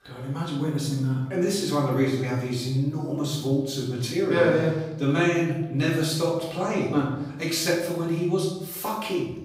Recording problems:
off-mic speech; far
room echo; noticeable; dies away in 0.8 s

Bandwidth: 15.5 kHz